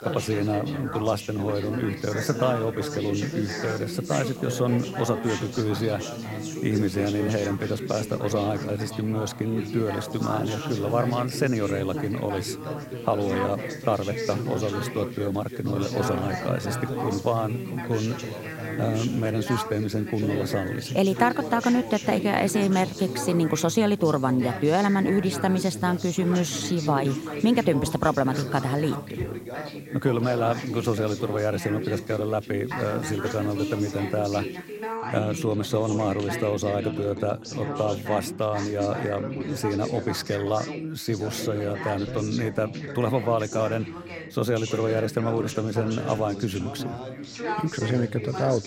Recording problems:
background chatter; loud; throughout; 3 voices, 7 dB below the speech
hiss; faint; until 35 s; 25 dB below the speech

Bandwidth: 16 kHz